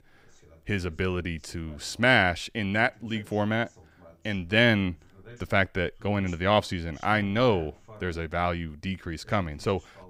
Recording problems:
voice in the background; faint; throughout; 25 dB below the speech

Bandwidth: 15.5 kHz